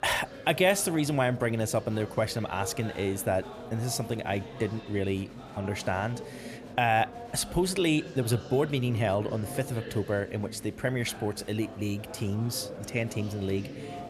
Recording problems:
murmuring crowd; noticeable; throughout; 15 dB below the speech

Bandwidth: 15 kHz